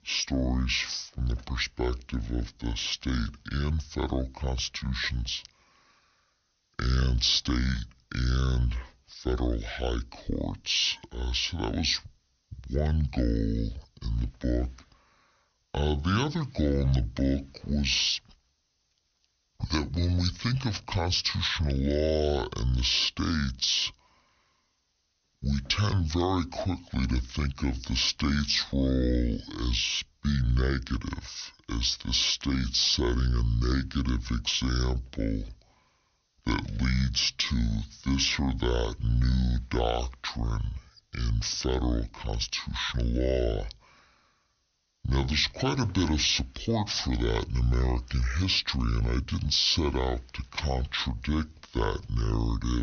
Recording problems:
wrong speed and pitch; too slow and too low; 0.6 times normal speed
high frequencies cut off; noticeable; nothing above 6.5 kHz
abrupt cut into speech; at the end

